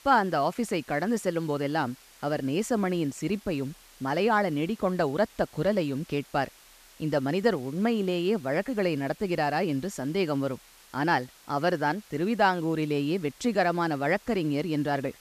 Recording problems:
hiss; faint; throughout; 25 dB below the speech

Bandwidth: 14.5 kHz